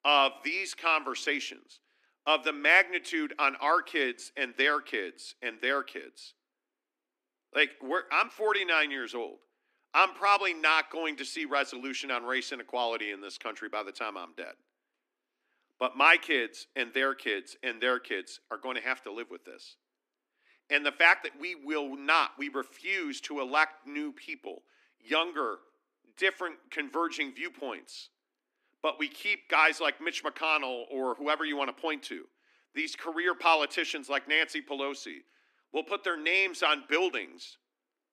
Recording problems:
thin; somewhat; fading below 250 Hz

